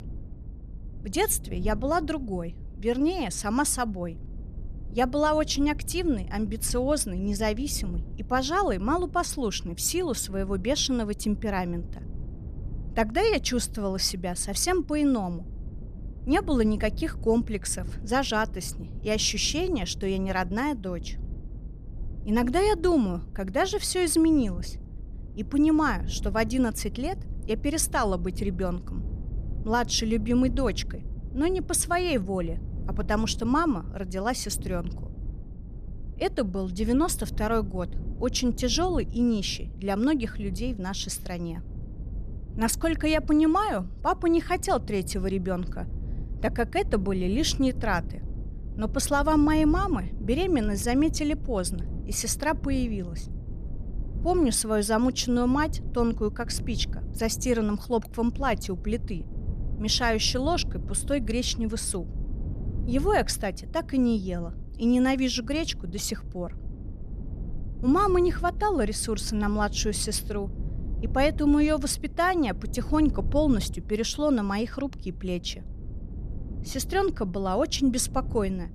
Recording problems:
low rumble; faint; throughout; 20 dB below the speech

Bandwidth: 14.5 kHz